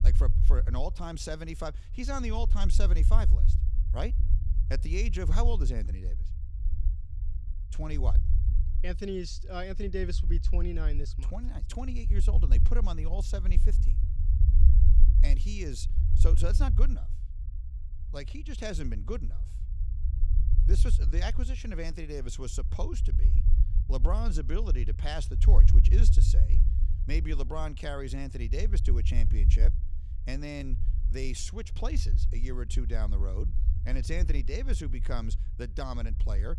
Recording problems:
low rumble; loud; throughout; 9 dB below the speech

